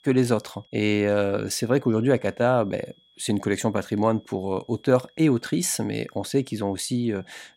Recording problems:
high-pitched whine; faint; throughout; 3.5 kHz, 35 dB below the speech

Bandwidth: 16 kHz